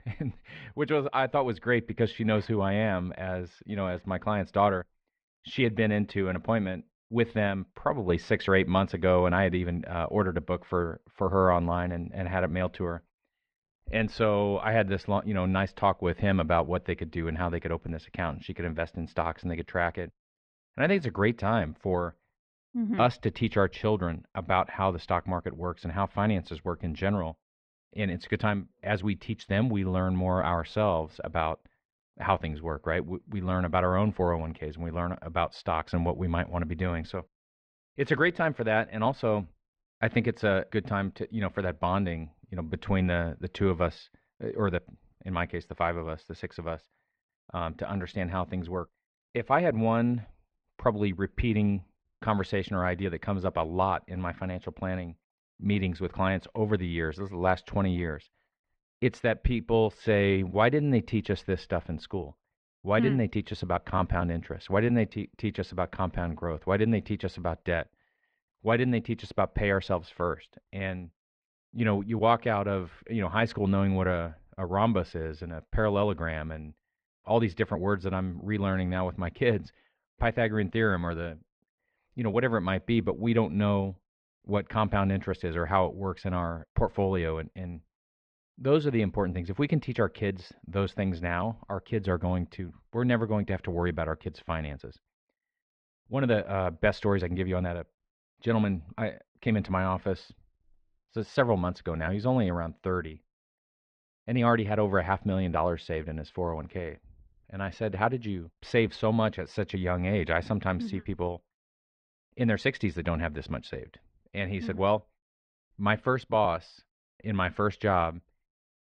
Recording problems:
muffled; very; fading above 2.5 kHz

